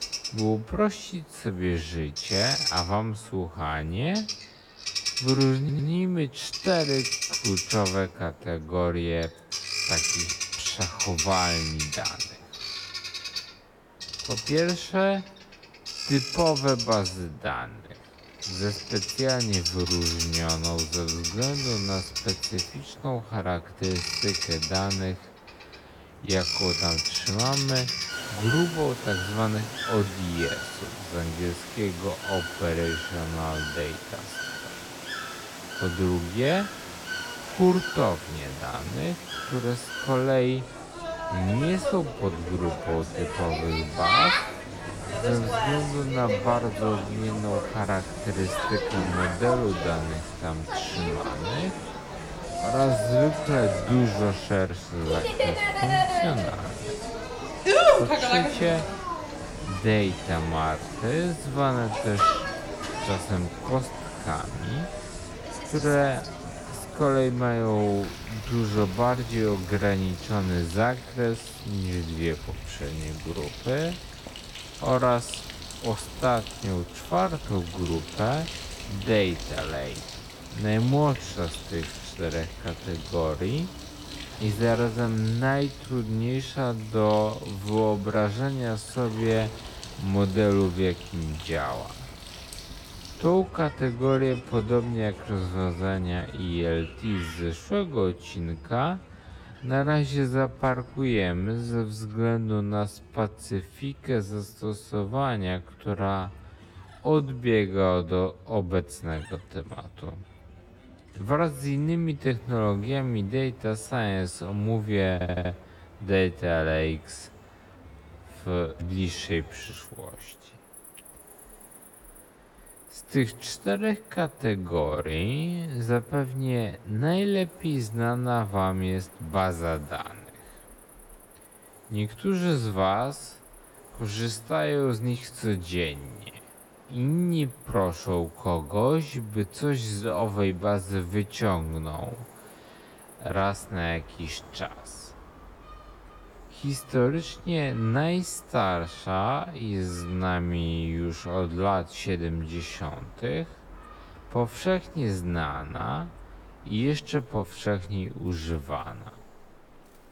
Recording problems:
wrong speed, natural pitch; too slow; 0.5 times normal speed
animal sounds; loud; throughout; 3 dB below the speech
hiss; faint; until 1:24 and from 1:52 on; 25 dB below the speech
audio stuttering; at 5.5 s and at 1:55

